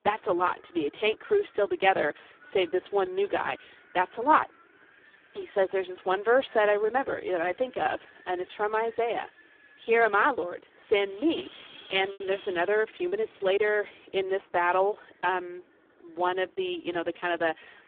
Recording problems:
phone-call audio; poor line
wind in the background; faint; throughout; 25 dB below the speech
choppy; occasionally; from 12 to 13 s; 4% of the speech affected

